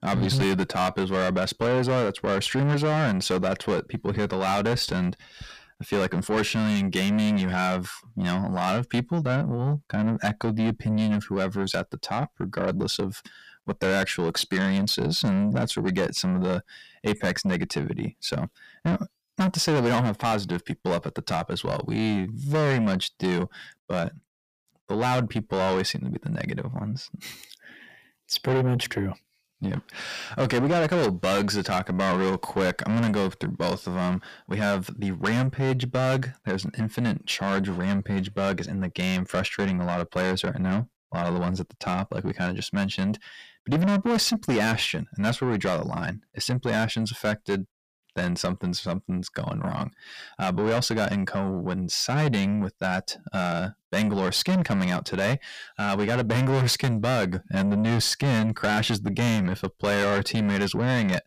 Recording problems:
distortion; heavy; 6 dB below the speech

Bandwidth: 15 kHz